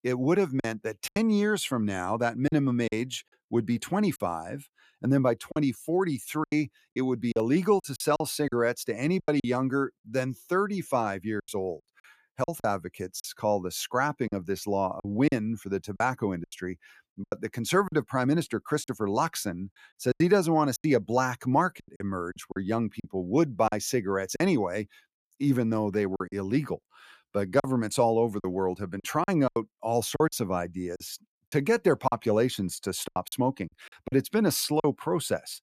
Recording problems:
choppy; very; 9% of the speech affected

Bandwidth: 14.5 kHz